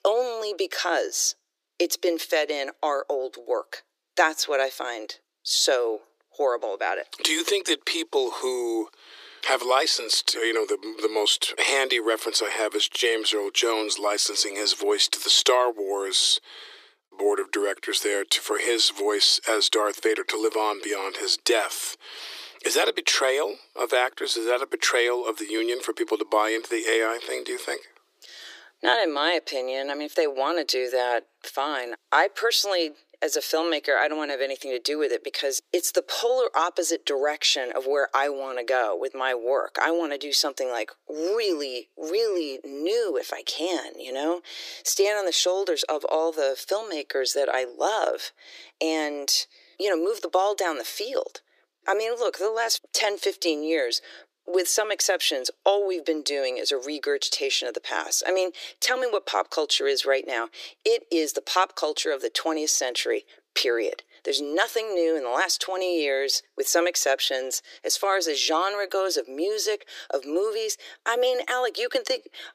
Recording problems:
thin; very; fading below 350 Hz

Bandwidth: 15 kHz